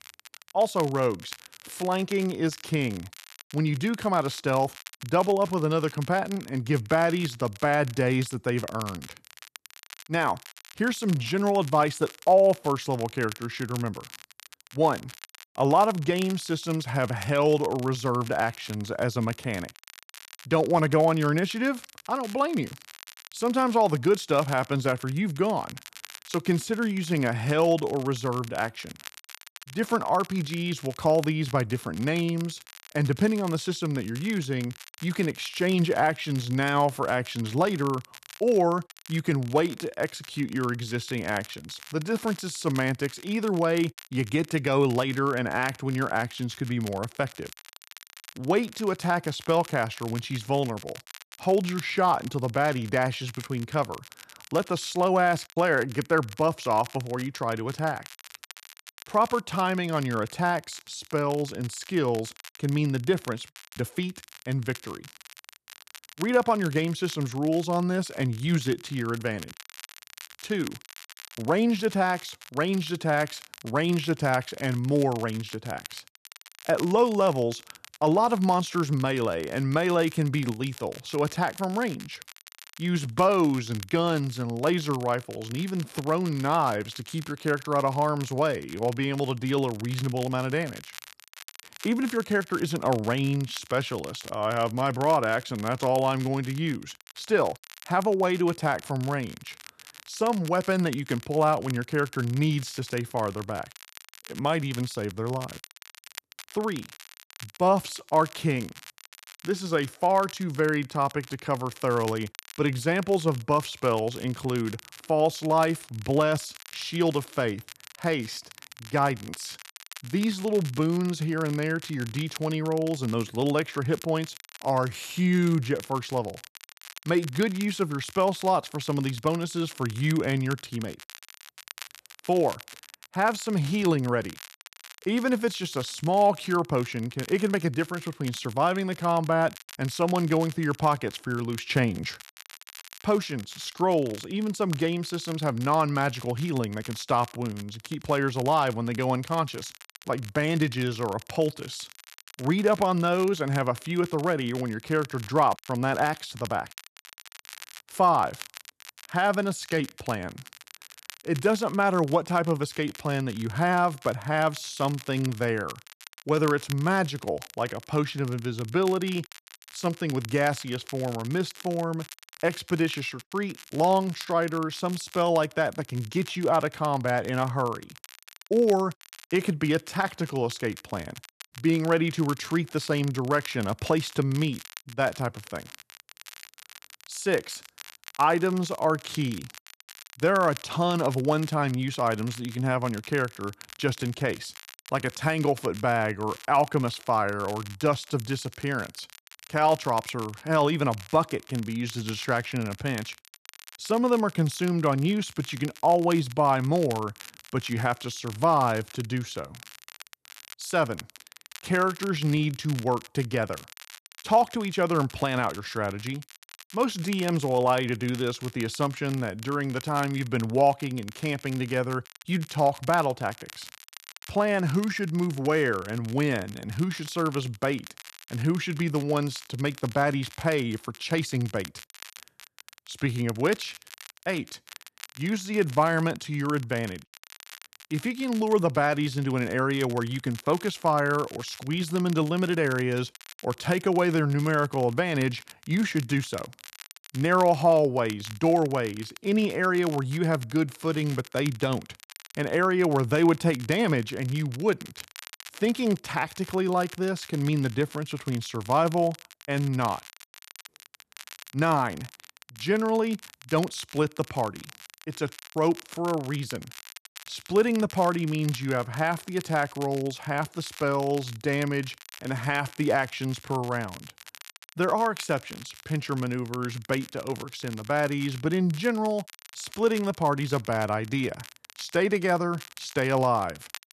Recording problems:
crackle, like an old record; noticeable; 20 dB below the speech

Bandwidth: 13.5 kHz